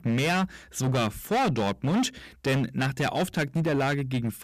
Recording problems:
distortion; heavy; 18% of the sound clipped

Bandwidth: 14.5 kHz